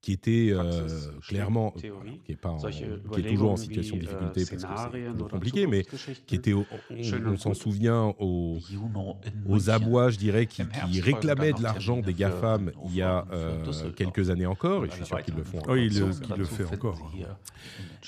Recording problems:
voice in the background; loud; throughout; 9 dB below the speech

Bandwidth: 14.5 kHz